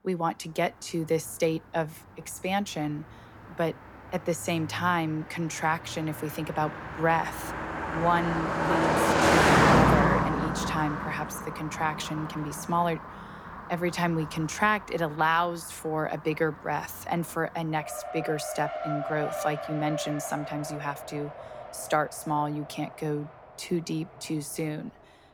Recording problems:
traffic noise; very loud; throughout; 2 dB above the speech

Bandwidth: 18 kHz